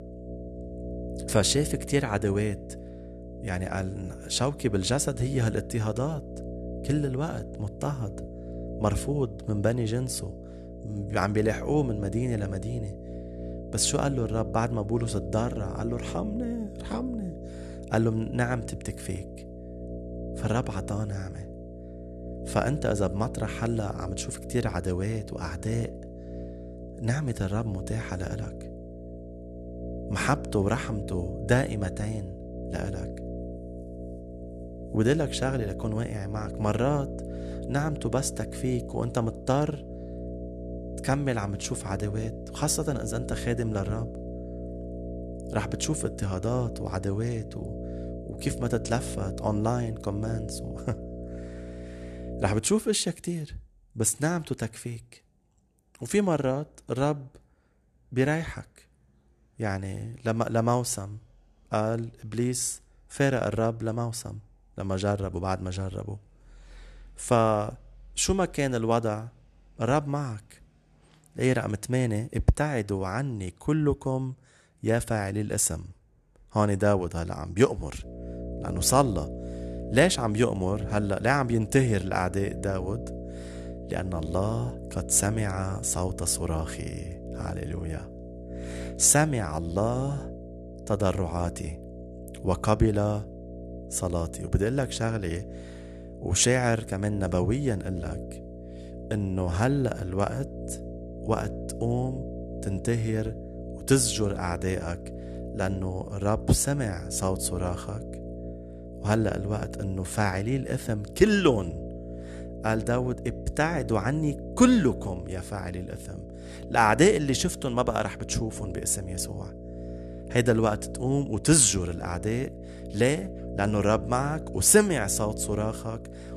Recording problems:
electrical hum; noticeable; until 53 s and from 1:18 on; 60 Hz, 15 dB below the speech

